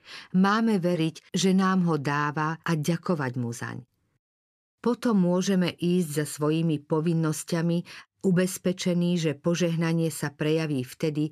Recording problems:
none

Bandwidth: 15 kHz